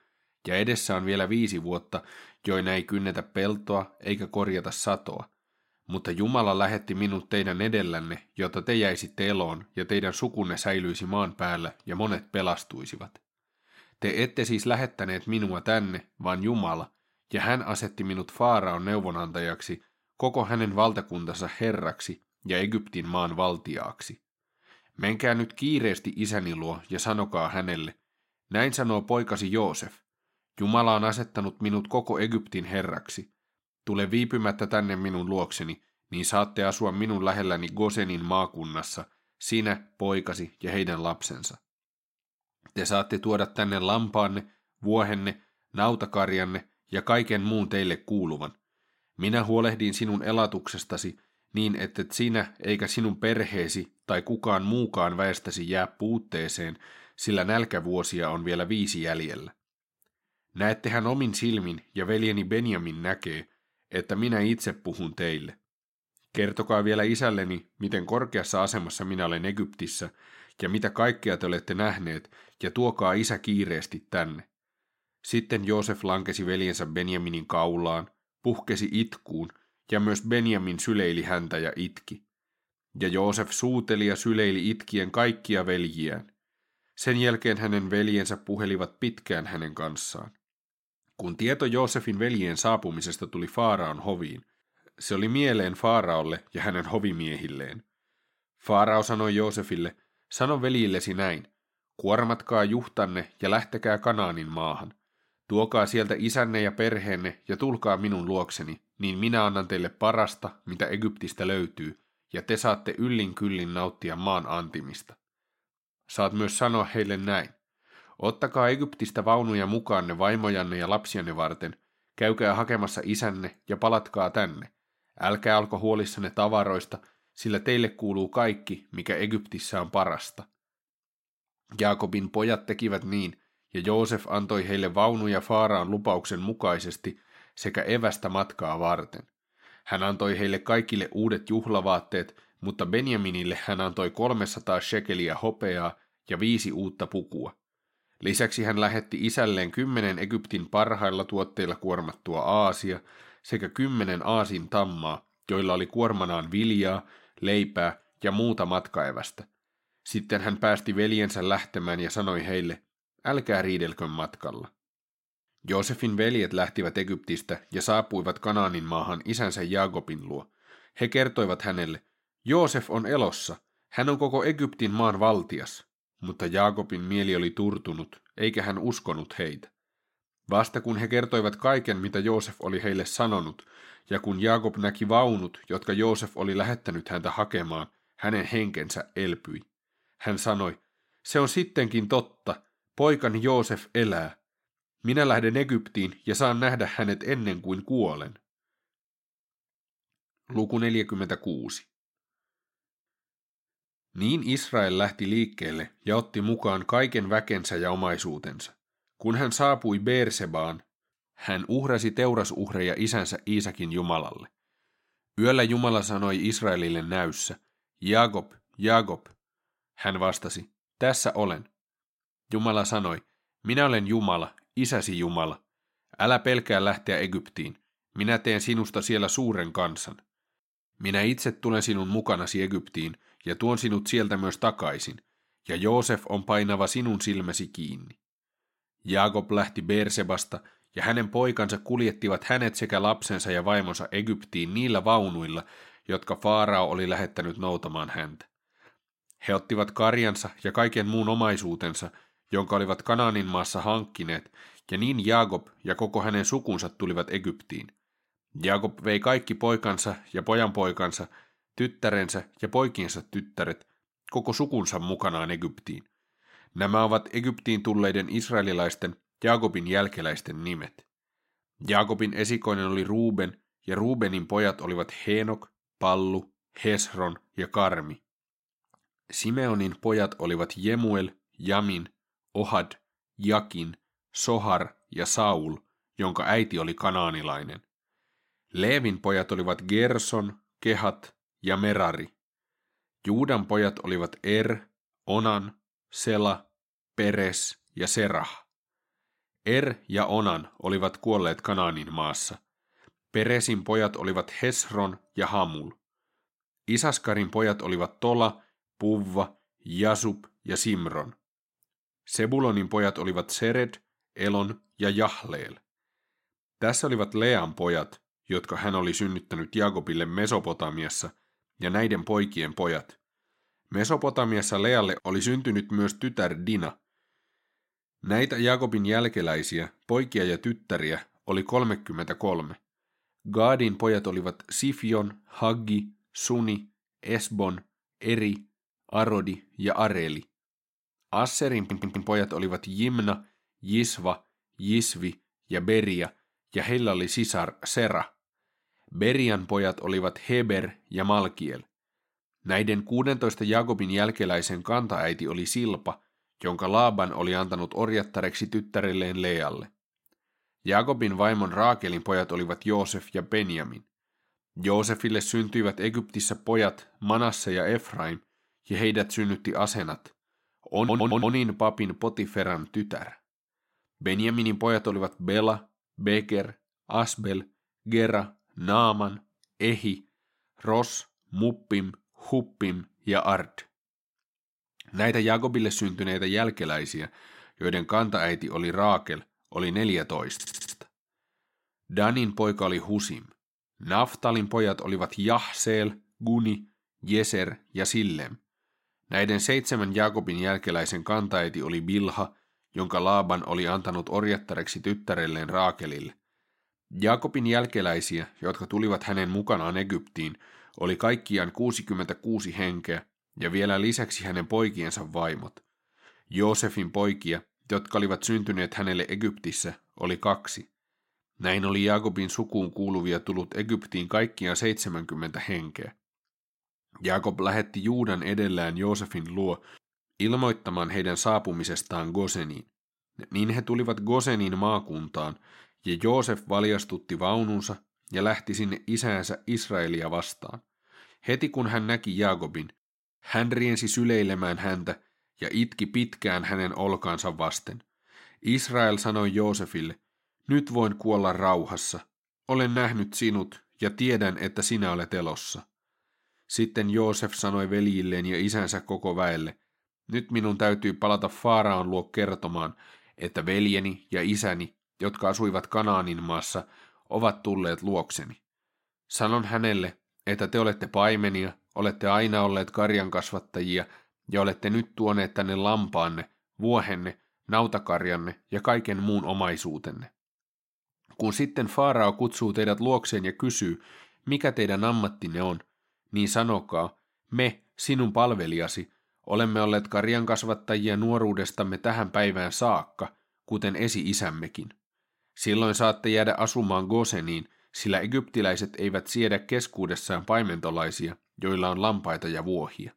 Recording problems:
audio stuttering; at 5:42, at 6:11 and at 6:31

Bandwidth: 16 kHz